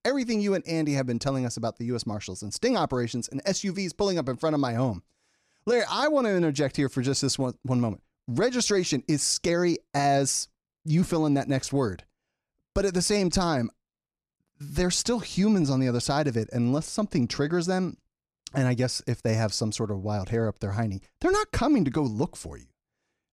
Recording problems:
none

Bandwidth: 14.5 kHz